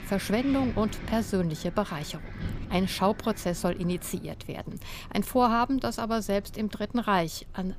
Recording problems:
wind in the background; noticeable; throughout; 15 dB below the speech

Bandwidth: 15 kHz